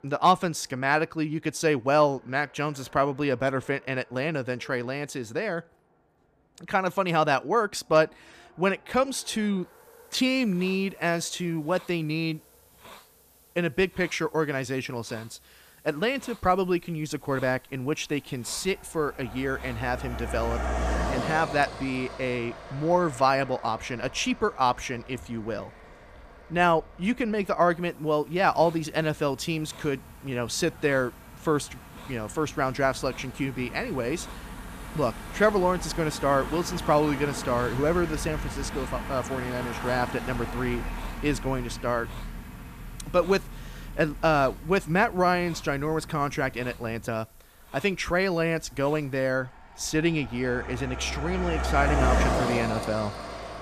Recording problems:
traffic noise; loud; throughout; 8 dB below the speech
hiss; faint; from 9.5 to 21 s and from 28 to 49 s; 25 dB below the speech

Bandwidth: 14.5 kHz